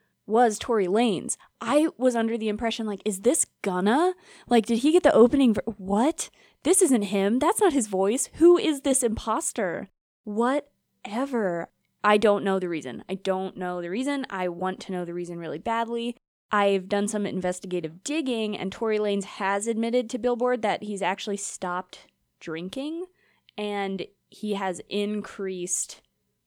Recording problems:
none

